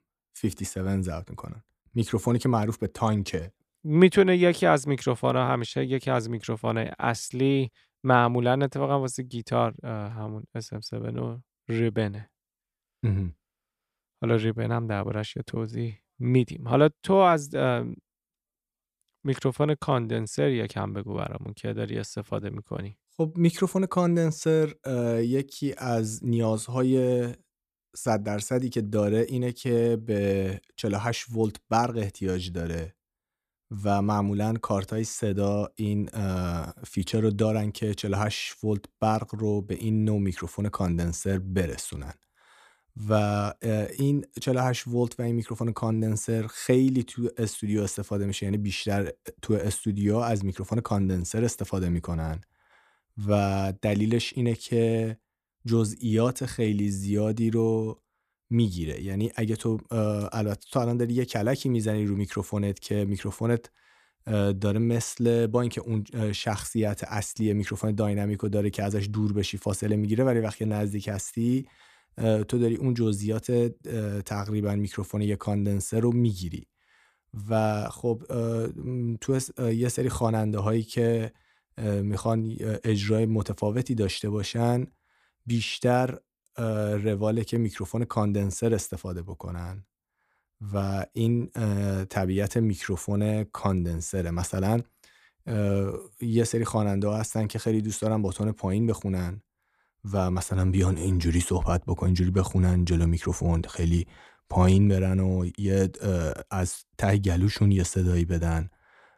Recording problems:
none

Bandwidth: 14.5 kHz